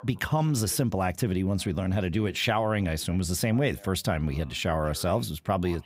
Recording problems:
voice in the background; faint; throughout; 25 dB below the speech

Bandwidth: 15.5 kHz